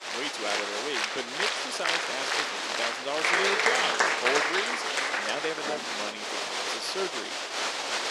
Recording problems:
thin; somewhat; fading below 450 Hz
crowd noise; very loud; throughout; 7 dB above the speech
high-pitched whine; very faint; throughout; 7.5 kHz, 30 dB below the speech

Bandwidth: 14.5 kHz